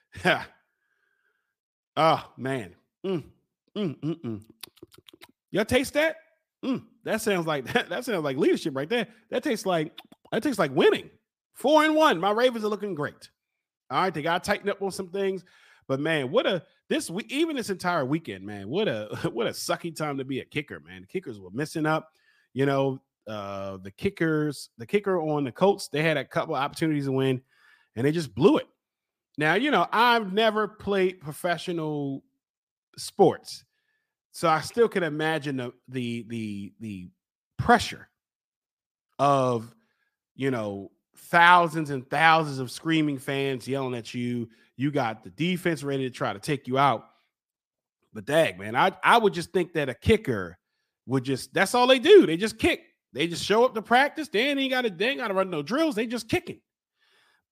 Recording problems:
none

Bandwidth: 15 kHz